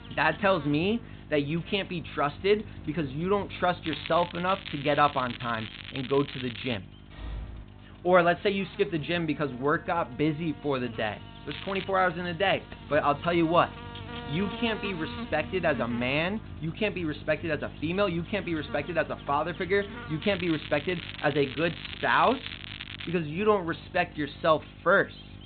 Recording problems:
high frequencies cut off; severe; nothing above 4 kHz
electrical hum; noticeable; throughout; 50 Hz, 20 dB below the speech
crackling; noticeable; from 4 to 7 s, at 12 s and from 20 to 23 s; 10 dB below the speech
door banging; faint; at 7 s; peak 15 dB below the speech

